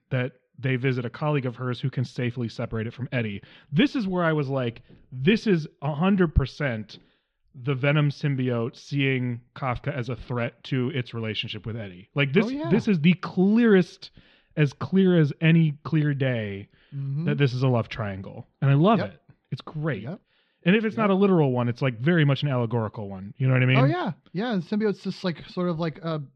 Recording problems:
muffled; slightly; fading above 3.5 kHz

